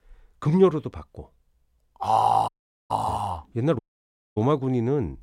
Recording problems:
audio cutting out; at 2.5 s and at 4 s for 0.5 s

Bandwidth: 16 kHz